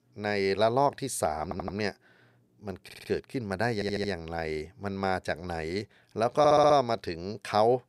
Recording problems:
audio stuttering; 4 times, first at 1.5 s

